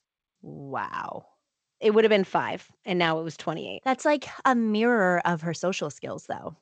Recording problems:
garbled, watery; slightly; nothing above 7.5 kHz

